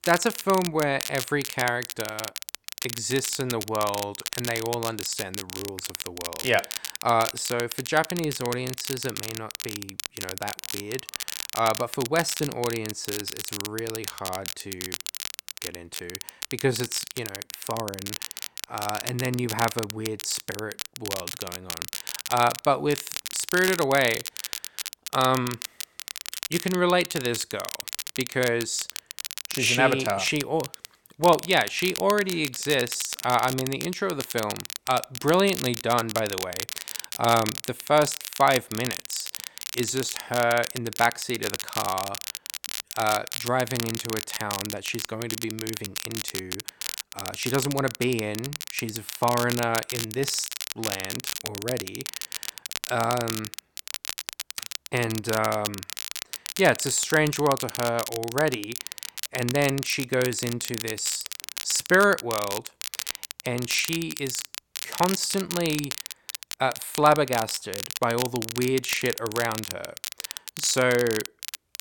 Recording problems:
crackle, like an old record; loud; 7 dB below the speech

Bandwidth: 17.5 kHz